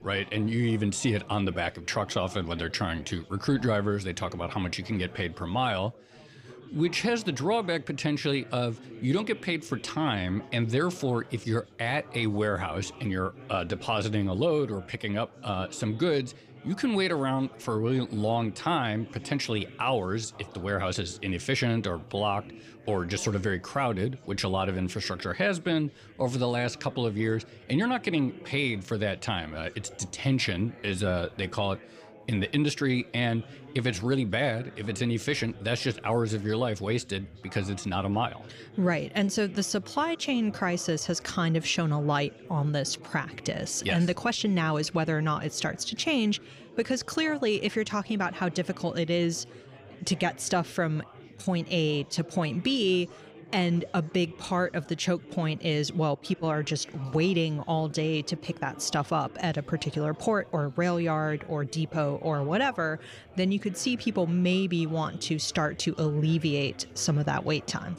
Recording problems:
chatter from many people; noticeable; throughout; 20 dB below the speech

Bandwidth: 15 kHz